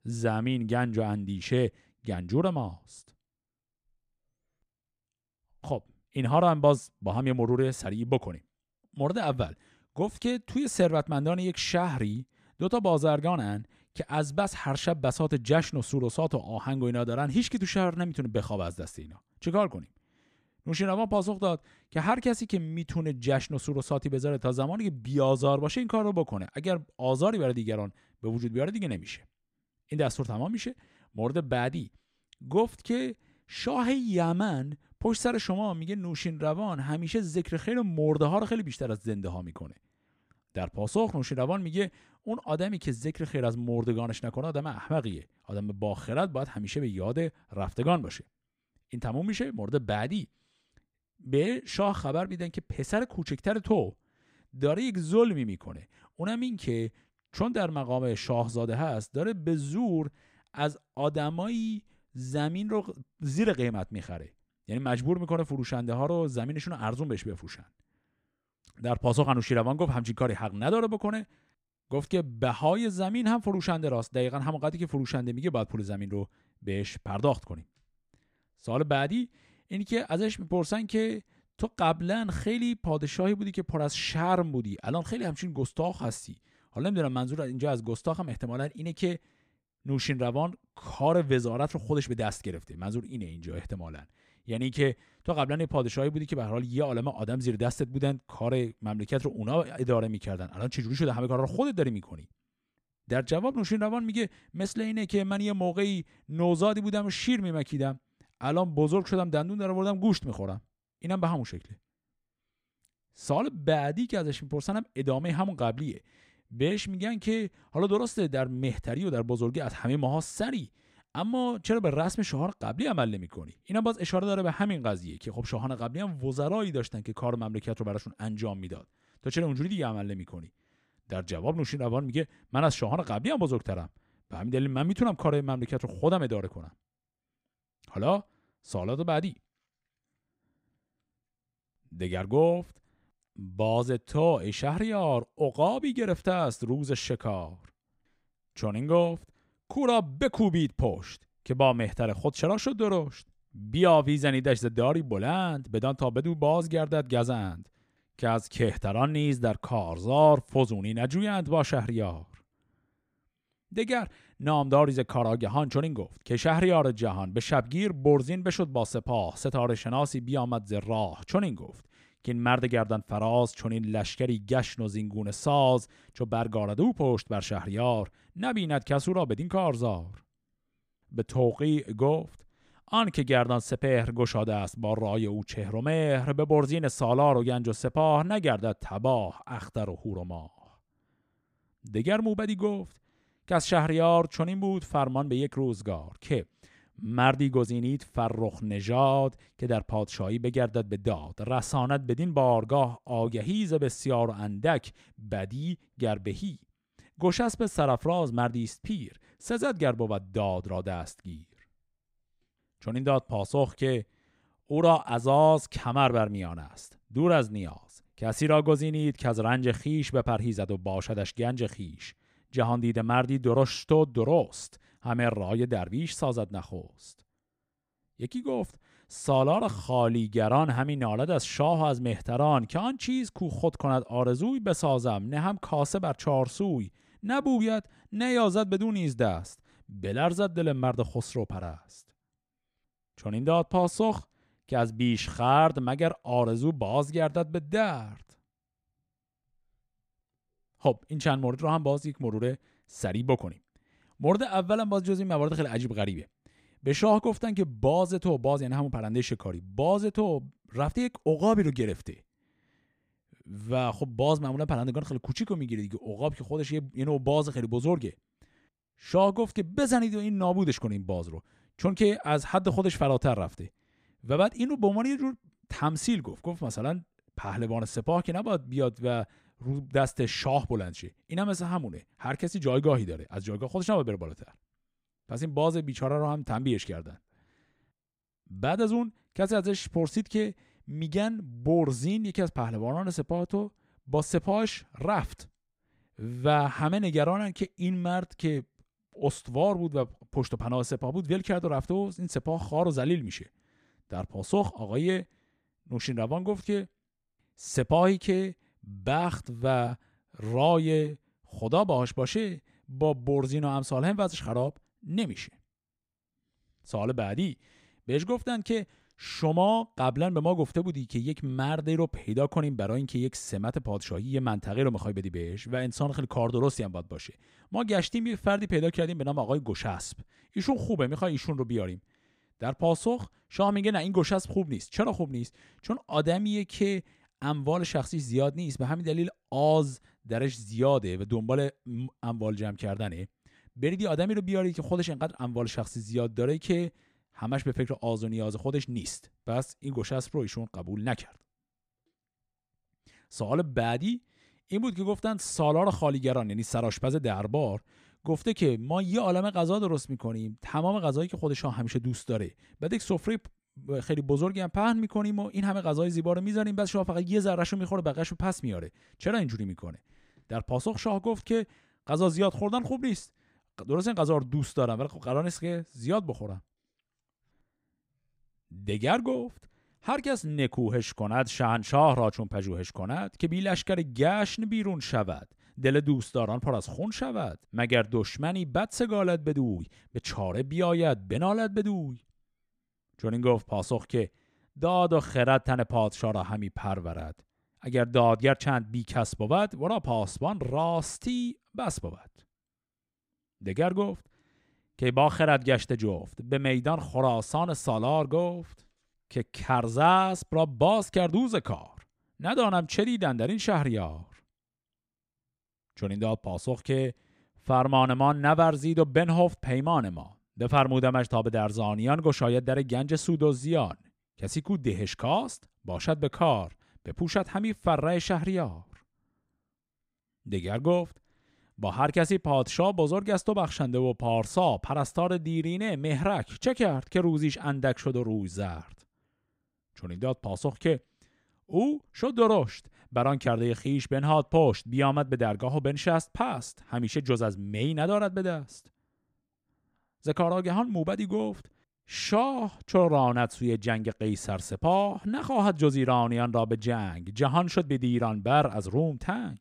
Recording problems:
none

